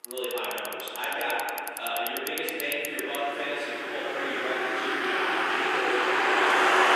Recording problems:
room echo; strong; dies away in 2.7 s
off-mic speech; far
thin; somewhat; fading below 400 Hz
traffic noise; very loud; throughout; 4 dB above the speech

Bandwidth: 15 kHz